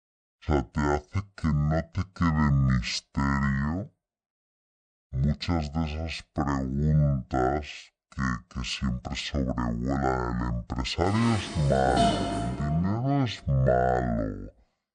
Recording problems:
wrong speed and pitch; too slow and too low; 0.5 times normal speed
clattering dishes; loud; from 11 to 13 s; peak 2 dB above the speech

